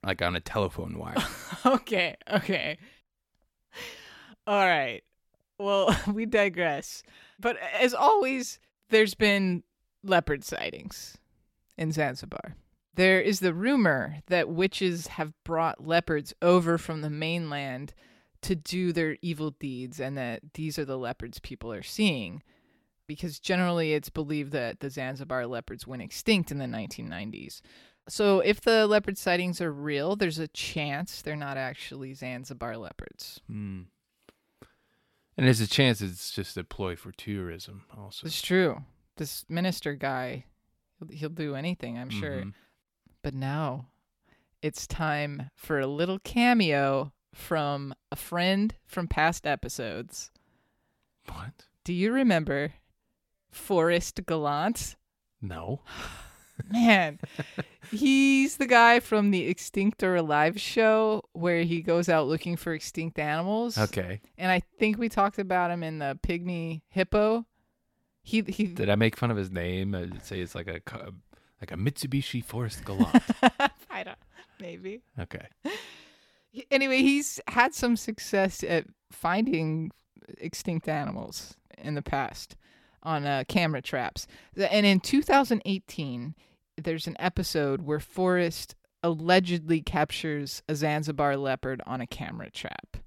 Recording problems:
none

